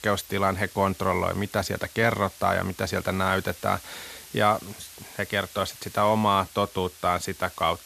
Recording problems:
hiss; noticeable; throughout; 20 dB below the speech

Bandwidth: 14 kHz